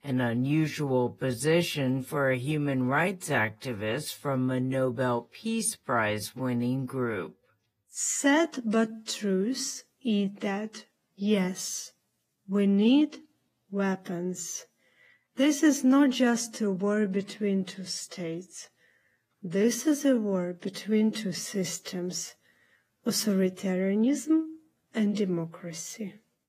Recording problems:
wrong speed, natural pitch; too slow; 0.7 times normal speed
garbled, watery; slightly; nothing above 15 kHz

